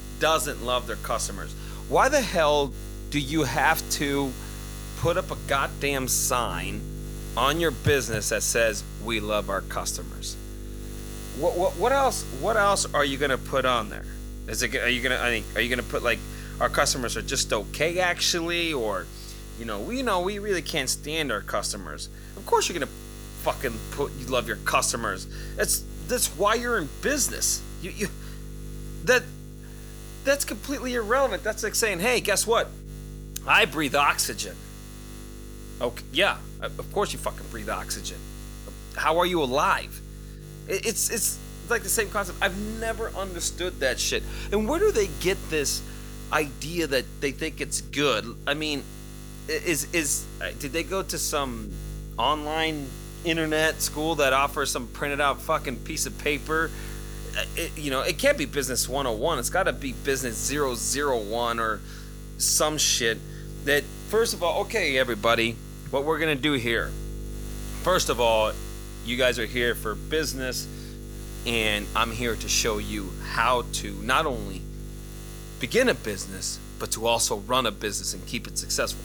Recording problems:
electrical hum; noticeable; throughout; 50 Hz, 20 dB below the speech

